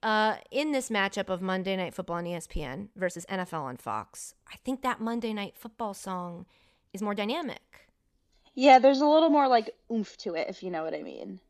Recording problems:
uneven, jittery; strongly; from 1.5 to 10 s

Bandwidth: 14.5 kHz